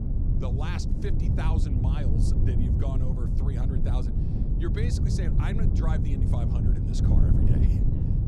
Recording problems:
wind noise on the microphone; heavy; 2 dB above the speech

